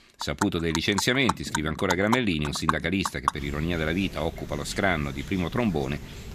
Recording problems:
animal sounds; loud; throughout; 7 dB below the speech

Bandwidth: 14 kHz